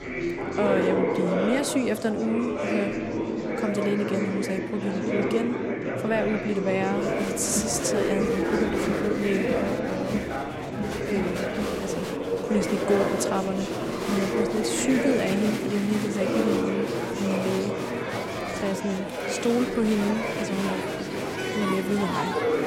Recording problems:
murmuring crowd; very loud; throughout; as loud as the speech

